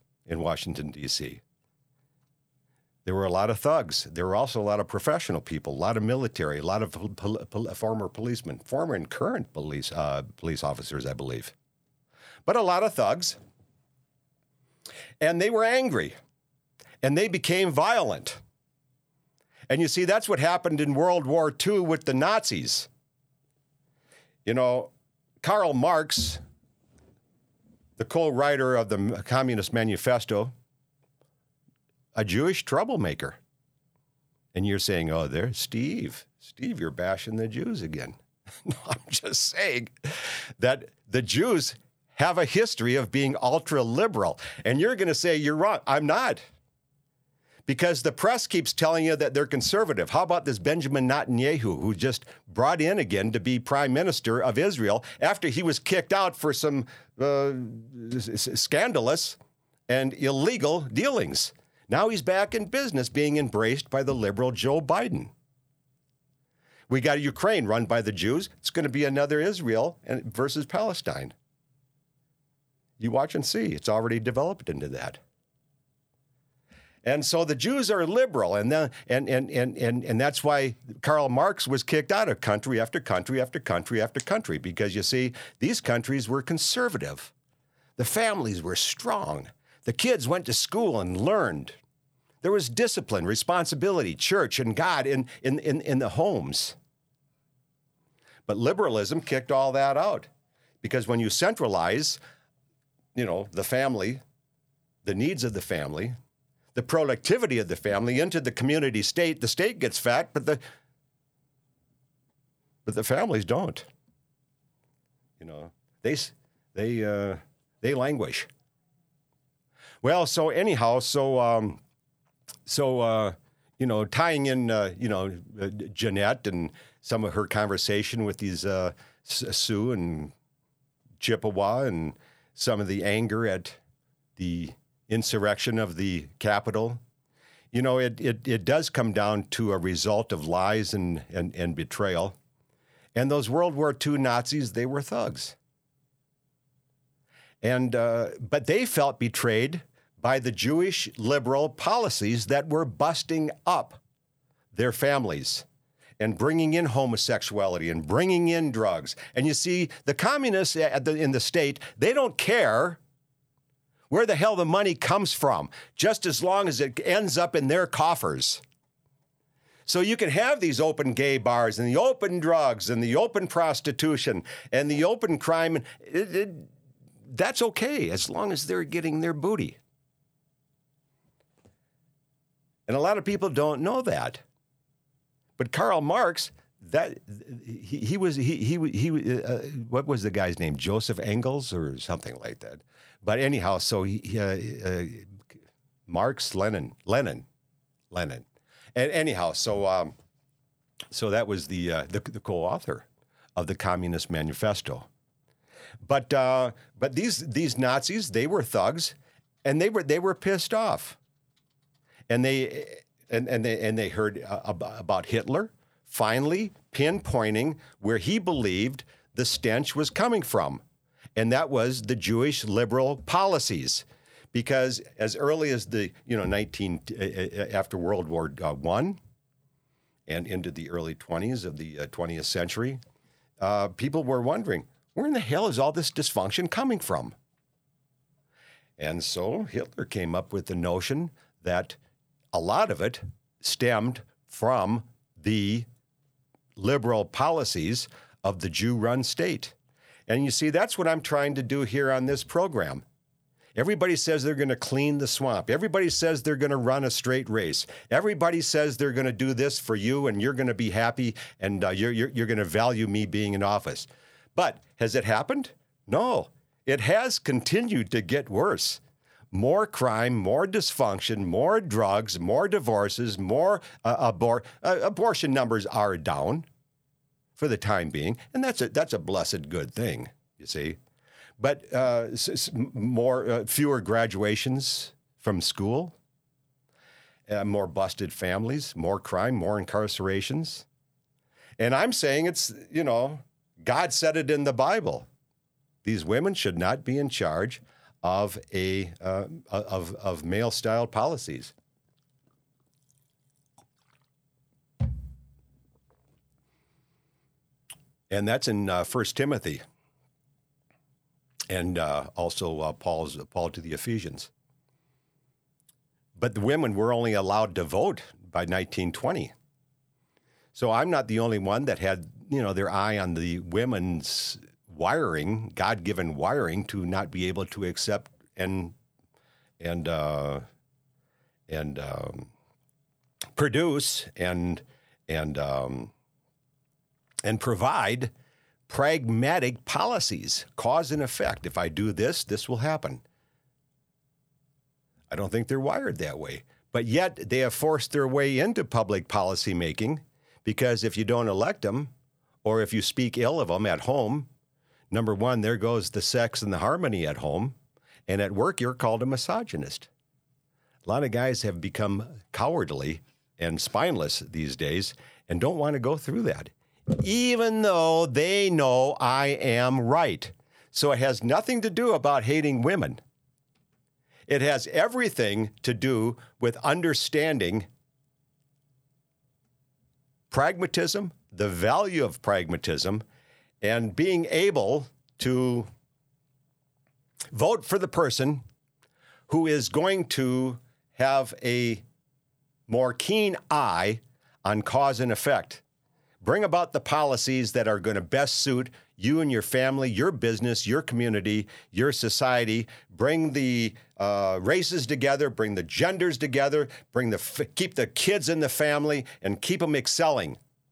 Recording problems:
none

